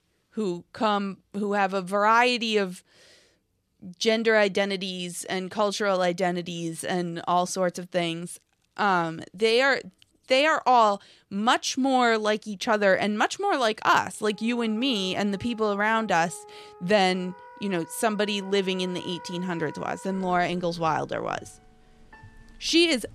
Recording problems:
background music; faint; from 14 s on; 20 dB below the speech

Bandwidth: 13.5 kHz